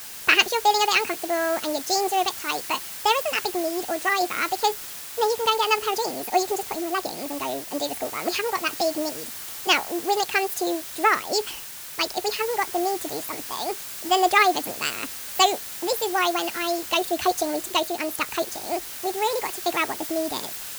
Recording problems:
wrong speed and pitch; too fast and too high; 1.6 times normal speed
hiss; loud; throughout; 9 dB below the speech

